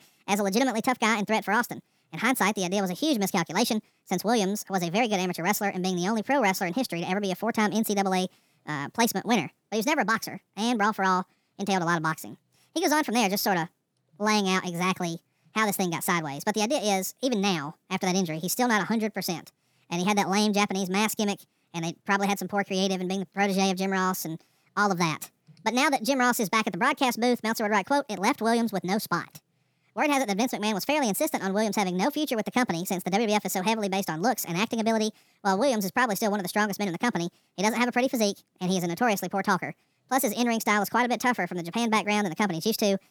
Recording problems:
wrong speed and pitch; too fast and too high; 1.6 times normal speed

